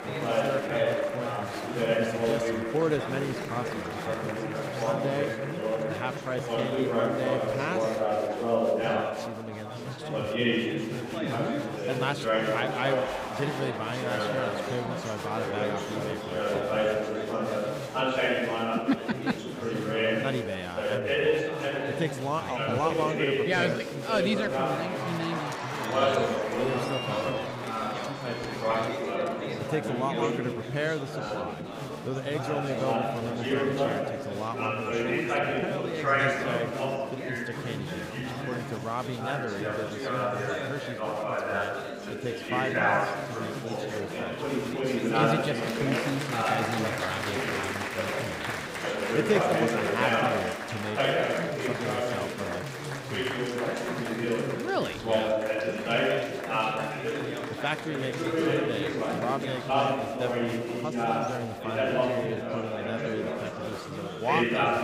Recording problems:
chatter from many people; very loud; throughout; 5 dB above the speech

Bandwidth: 15.5 kHz